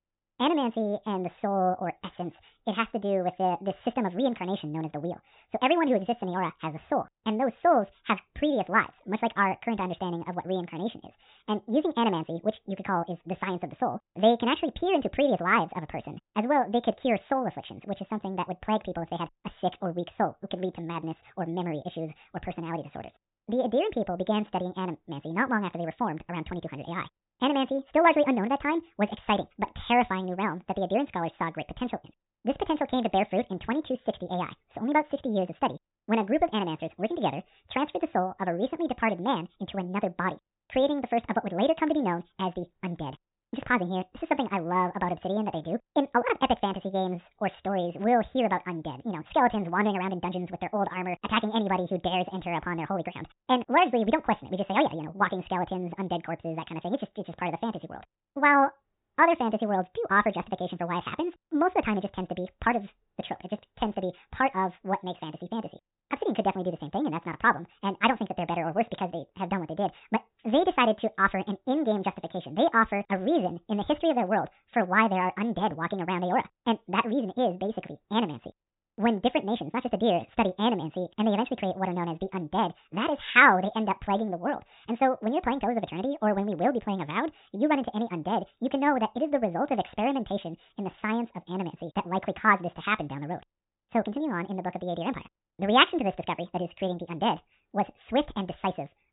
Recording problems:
high frequencies cut off; severe; nothing above 4 kHz
wrong speed and pitch; too fast and too high; 1.6 times normal speed

